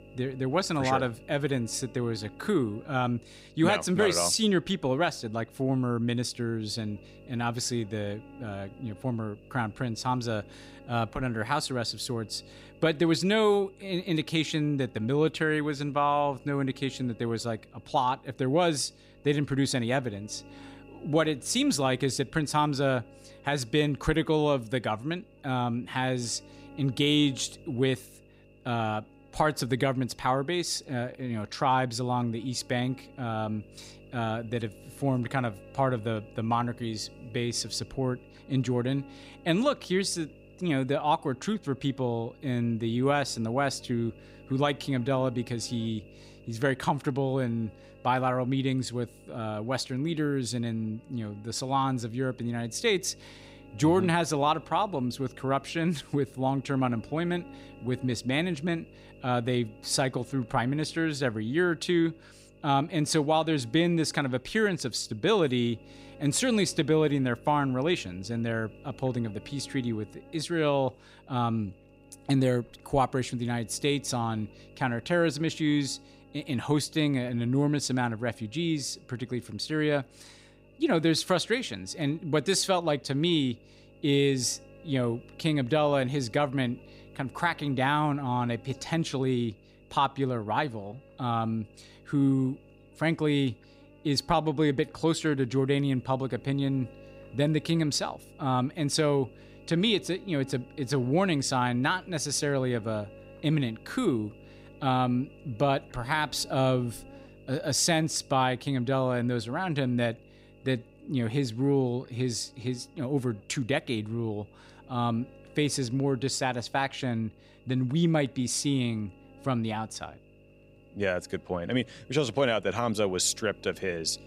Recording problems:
electrical hum; faint; throughout; 50 Hz, 25 dB below the speech

